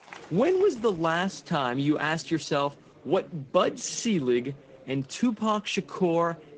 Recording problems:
garbled, watery; slightly
murmuring crowd; faint; throughout; 25 dB below the speech

